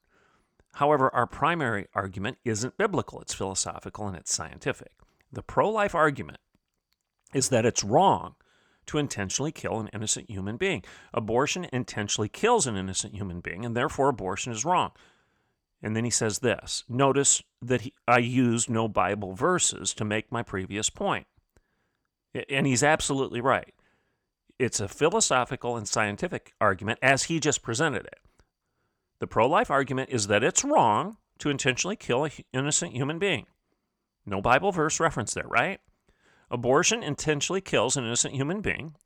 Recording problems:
none

